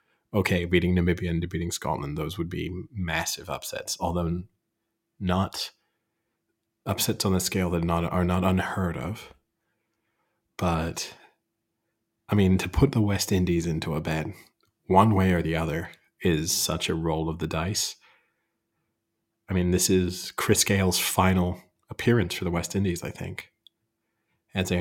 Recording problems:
abrupt cut into speech; at the end

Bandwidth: 16.5 kHz